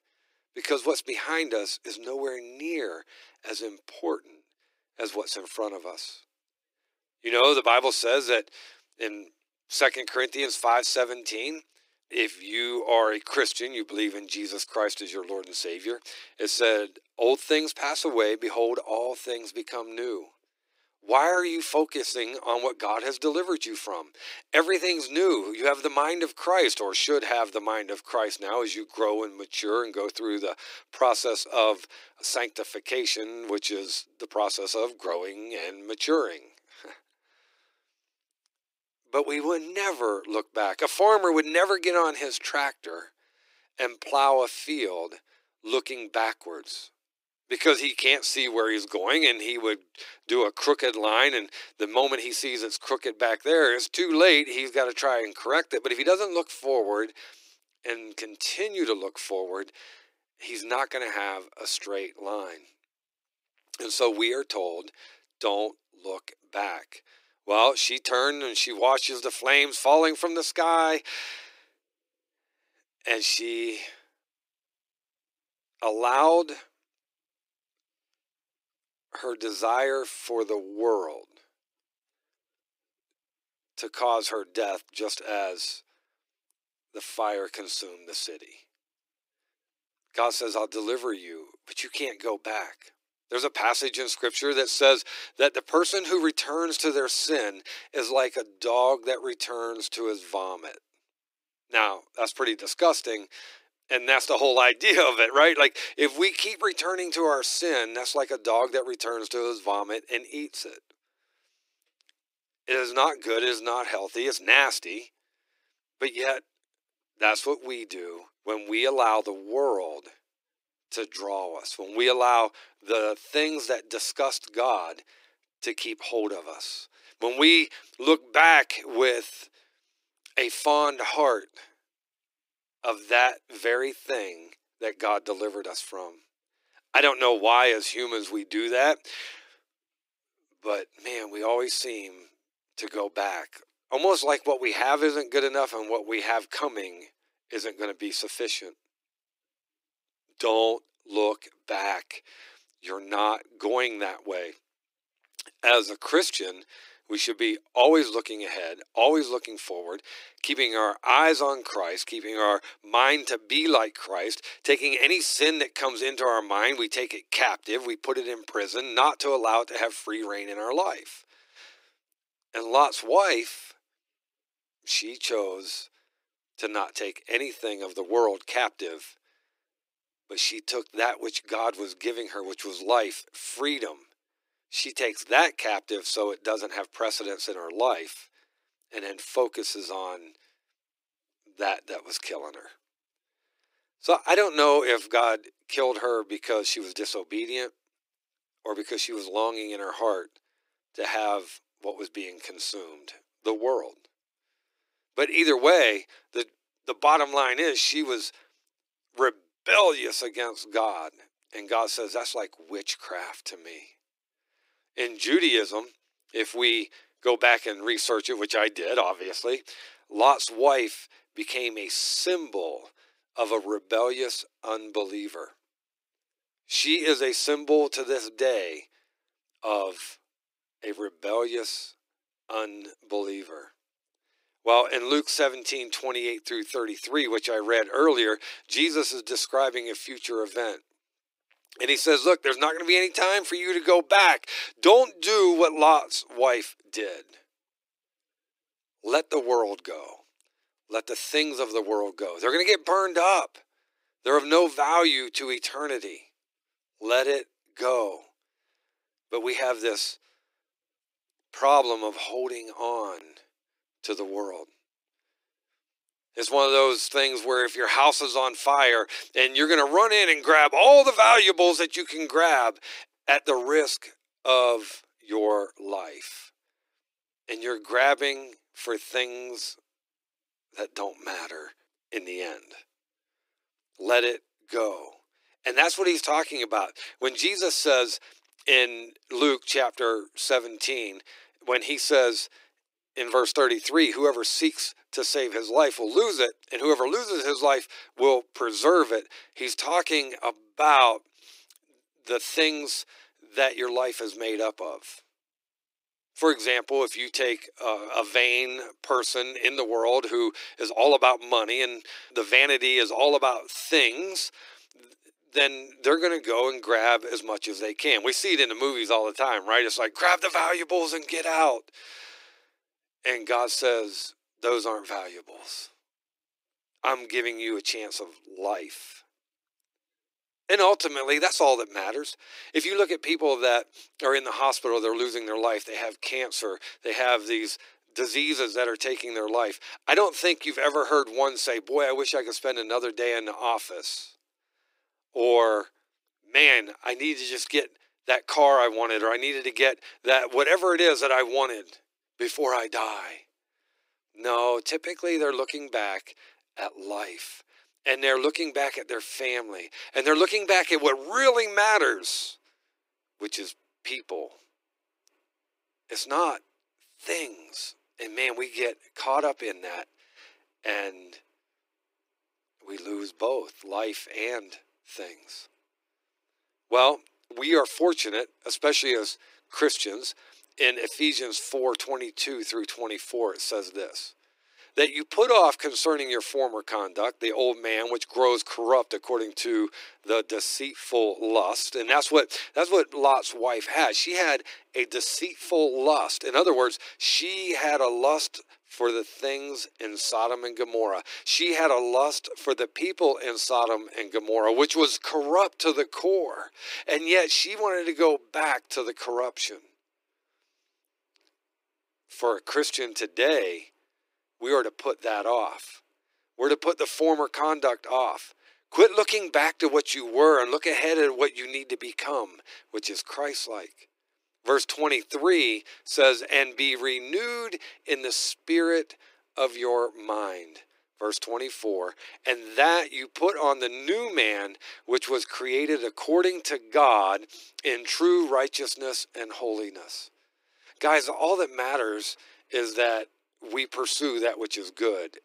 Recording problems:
thin; very; fading below 300 Hz

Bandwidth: 15.5 kHz